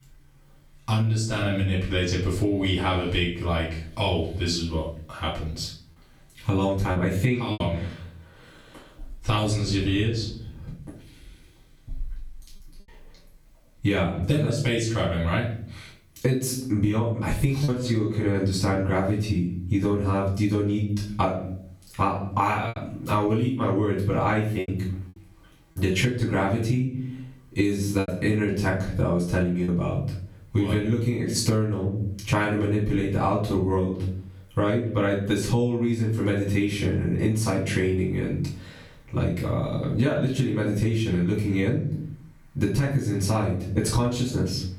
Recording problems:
off-mic speech; far
squashed, flat; heavily
room echo; noticeable; dies away in 0.5 s
choppy; occasionally; 1% of the speech affected

